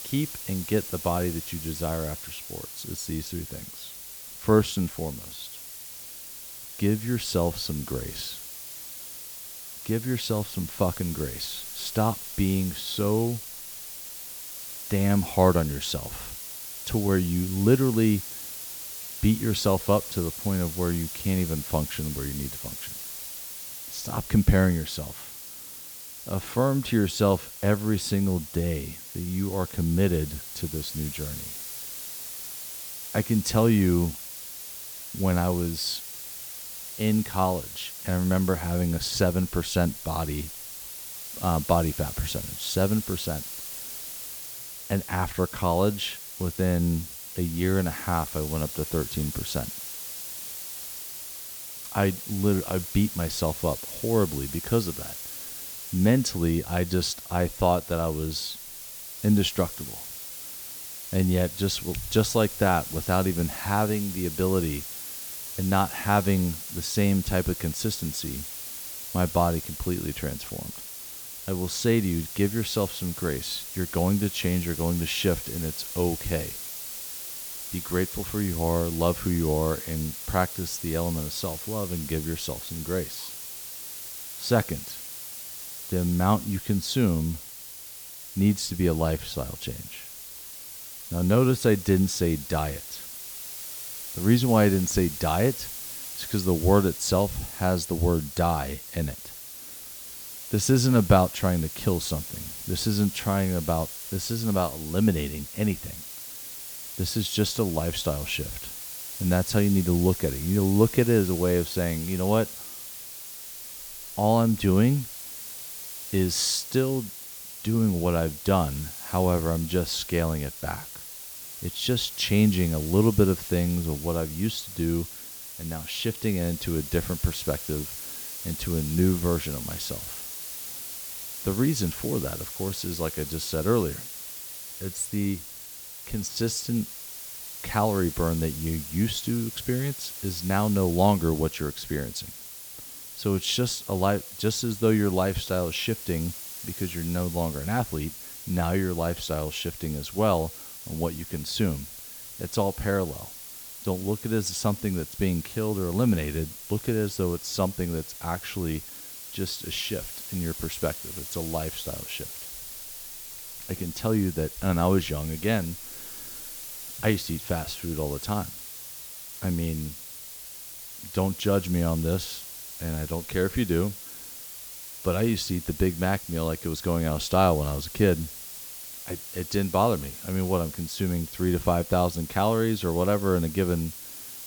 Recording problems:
hiss; loud; throughout; 9 dB below the speech

